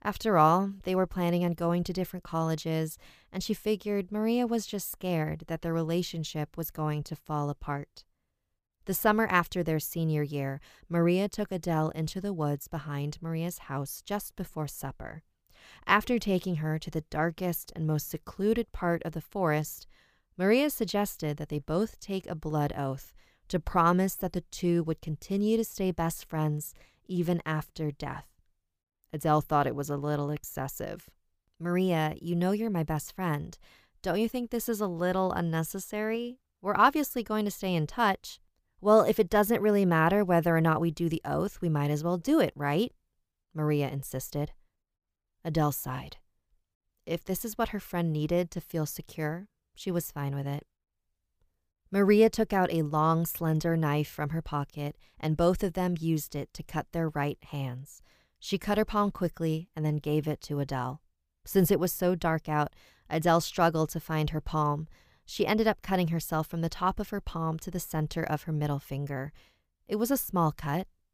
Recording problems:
none

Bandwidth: 15 kHz